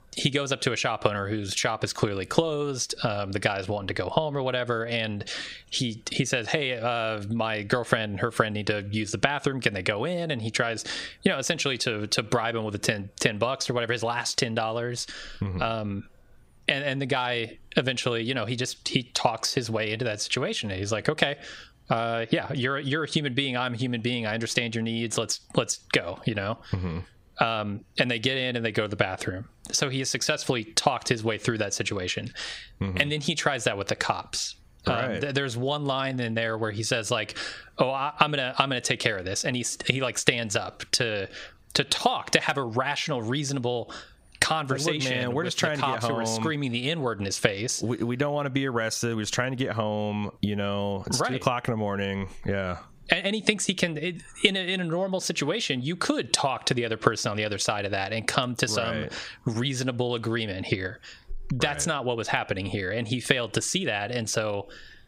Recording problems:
squashed, flat; somewhat

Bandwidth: 15.5 kHz